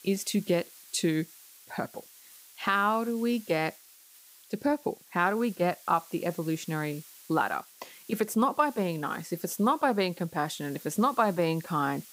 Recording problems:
hiss; faint; throughout; 20 dB below the speech

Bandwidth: 15.5 kHz